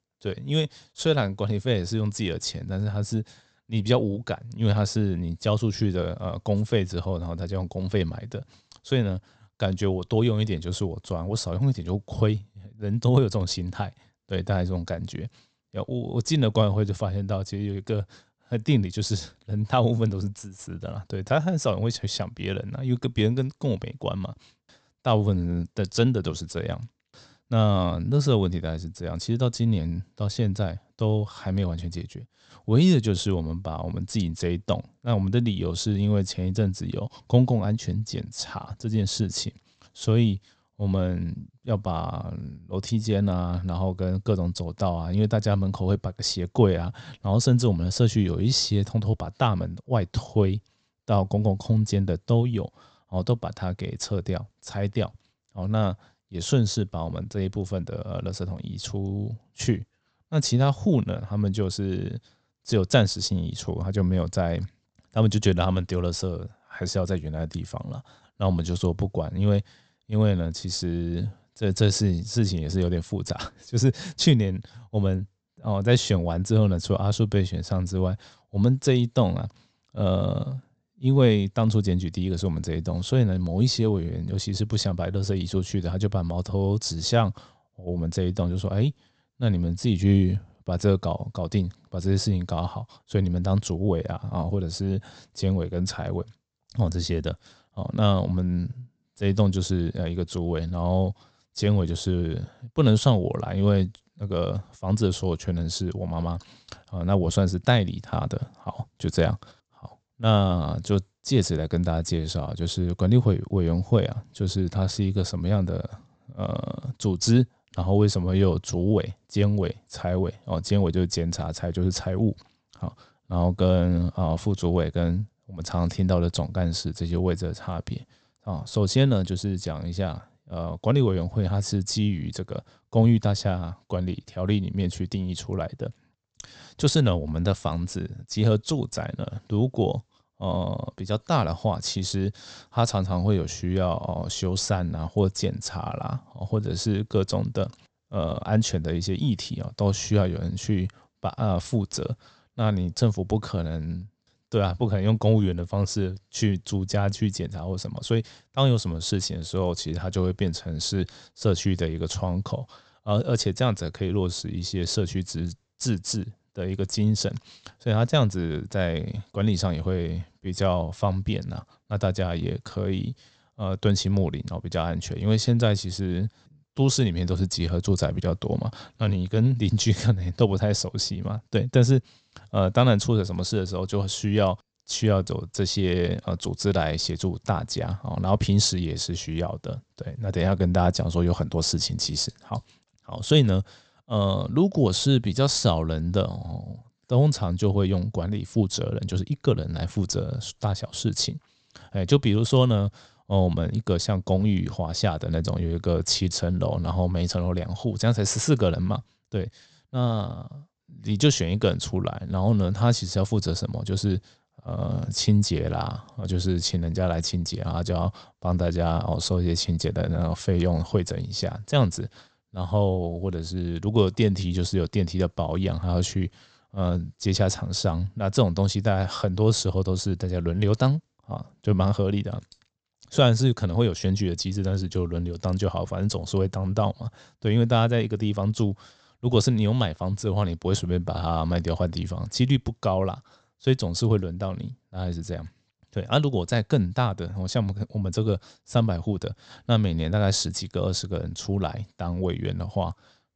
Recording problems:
high frequencies cut off; noticeable; nothing above 8 kHz

